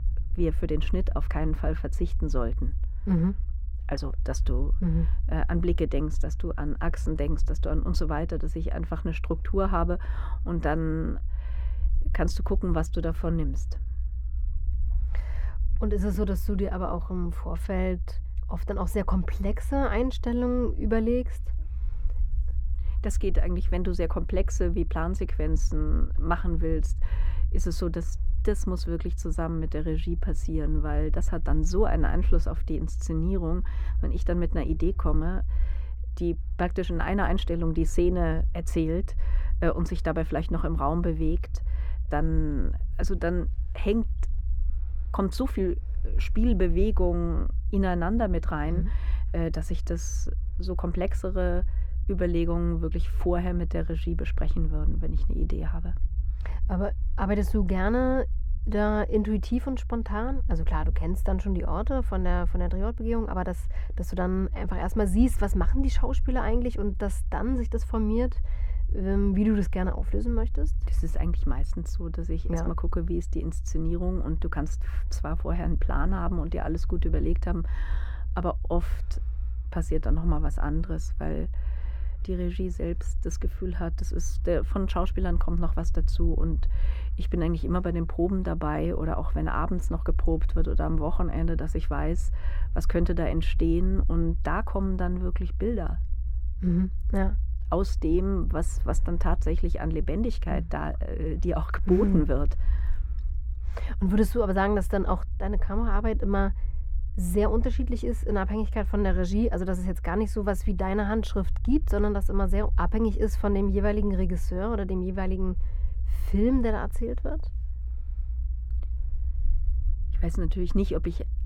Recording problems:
muffled; slightly; fading above 2.5 kHz
low rumble; faint; throughout; 20 dB below the speech

